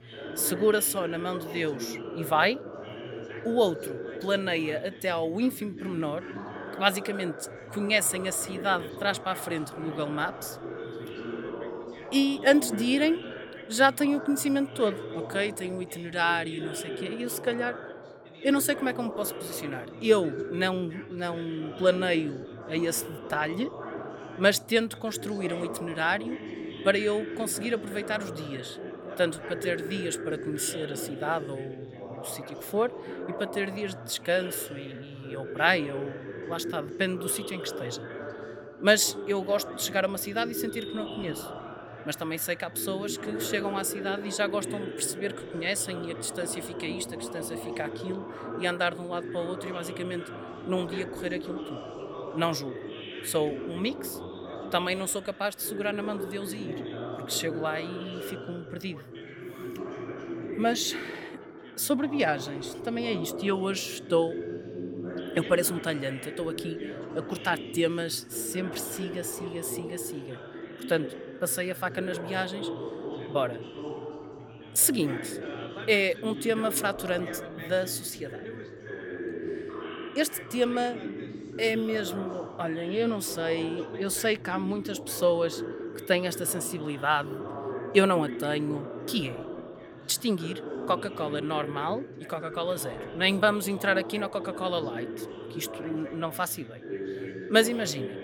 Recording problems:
background chatter; loud; throughout; 3 voices, 9 dB below the speech

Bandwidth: 18 kHz